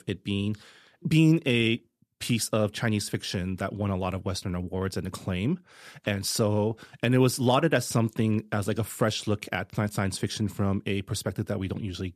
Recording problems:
none

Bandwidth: 14.5 kHz